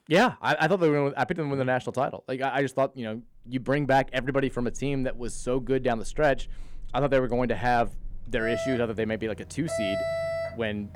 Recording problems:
alarms or sirens; loud; from 3.5 s on; 9 dB below the speech

